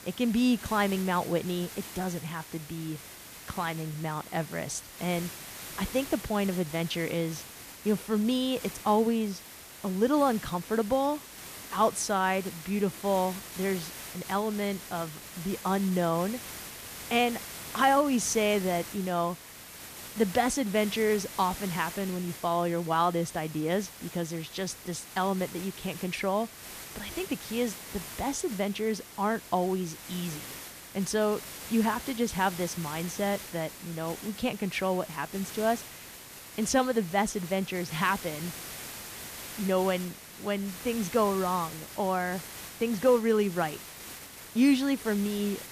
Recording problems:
hiss; noticeable; throughout; 10 dB below the speech

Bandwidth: 14.5 kHz